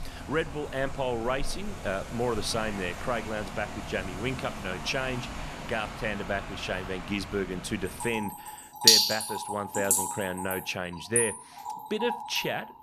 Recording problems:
rain or running water; very loud; throughout; 3 dB above the speech

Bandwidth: 14 kHz